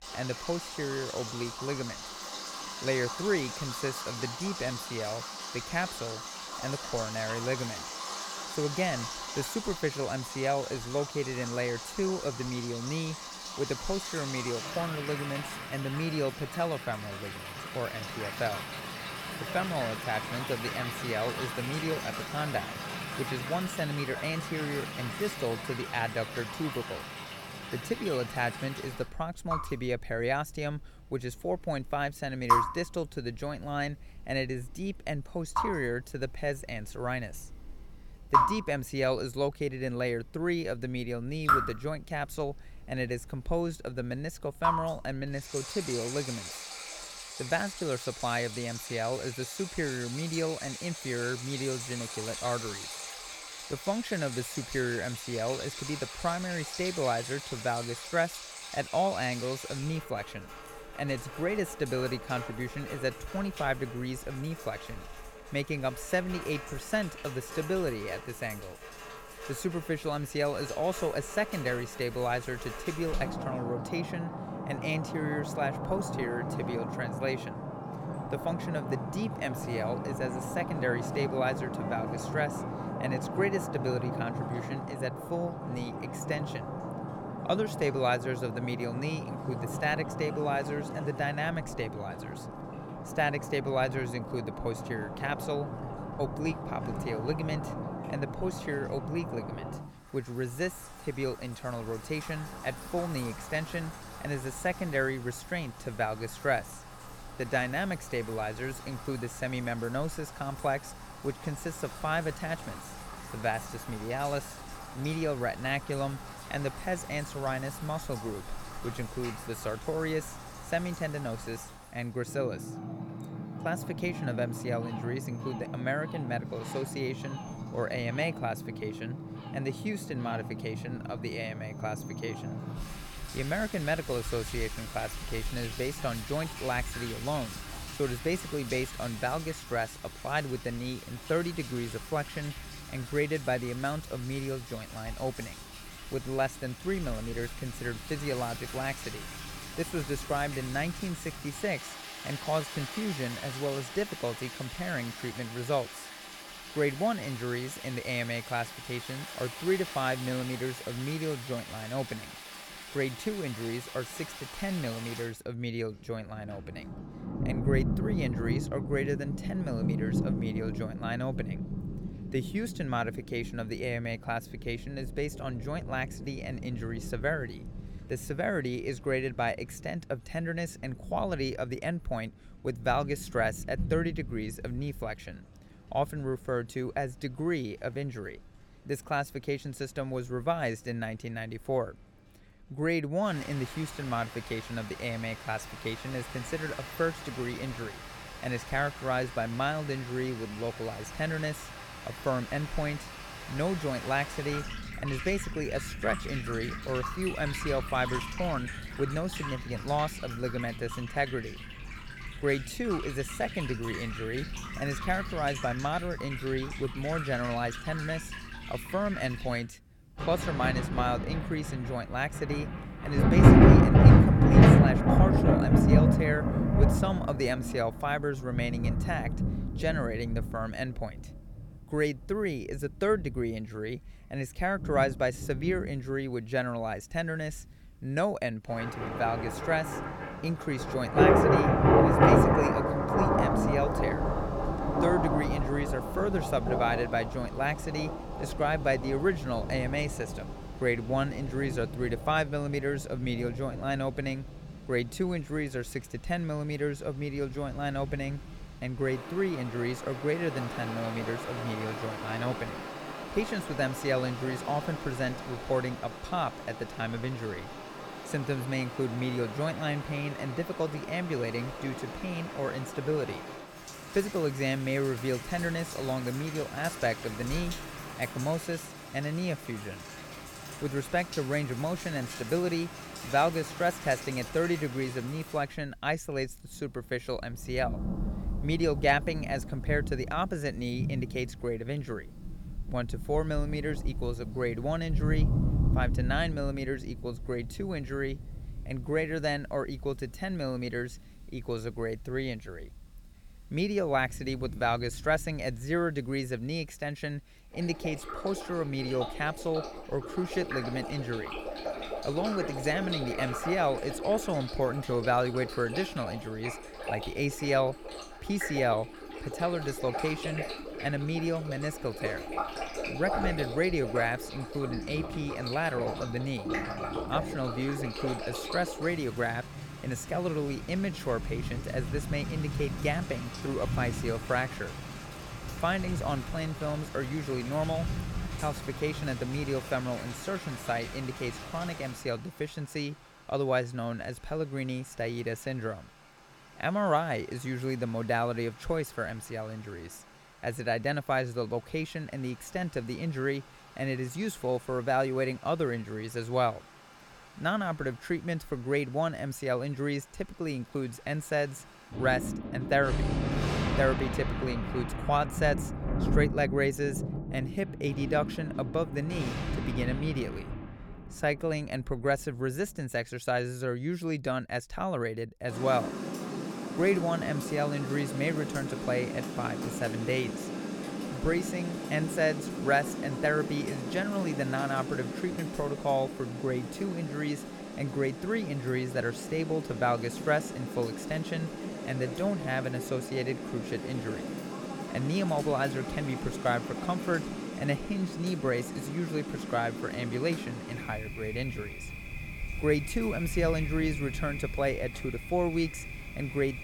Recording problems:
rain or running water; loud; throughout; 1 dB below the speech

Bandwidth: 17 kHz